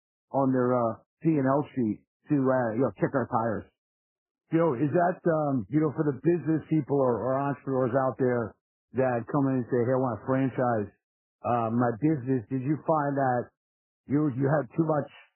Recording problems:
garbled, watery; badly; nothing above 3 kHz
muffled; very slightly; fading above 2.5 kHz

